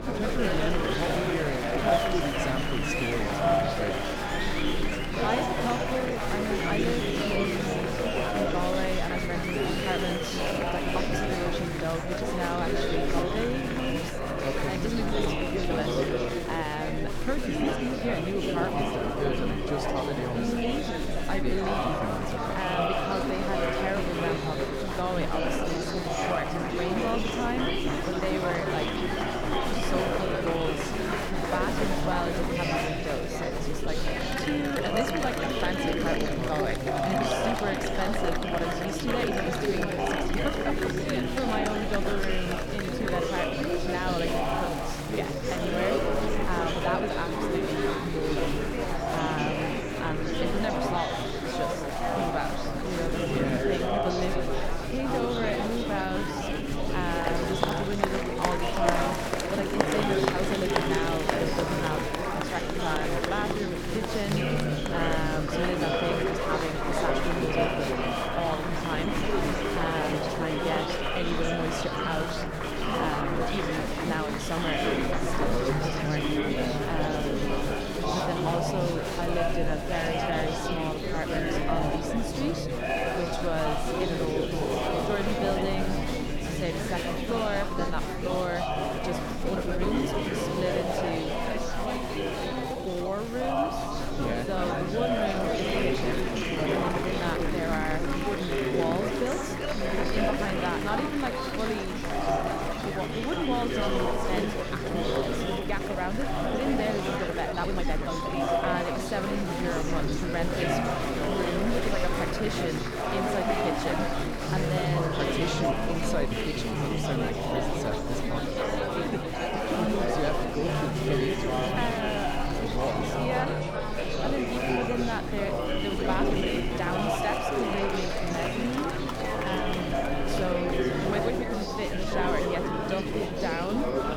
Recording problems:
chatter from many people; very loud; throughout; 4 dB above the speech
electrical hum; noticeable; throughout; 60 Hz, 10 dB below the speech
crackling; noticeable; from 44 to 47 s and from 1:01 to 1:02; 20 dB below the speech
uneven, jittery; strongly; from 1.5 s to 2:07

